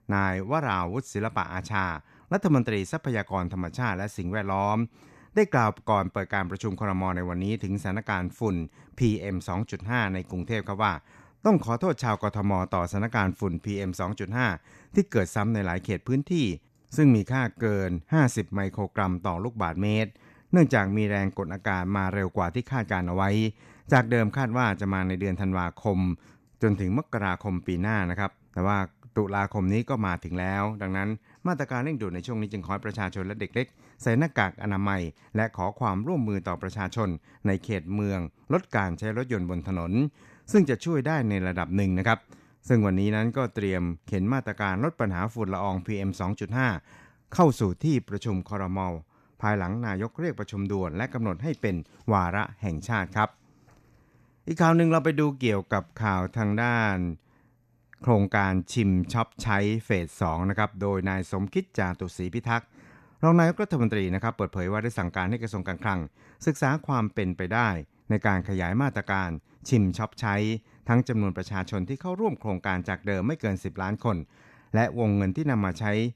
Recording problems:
none

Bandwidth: 14 kHz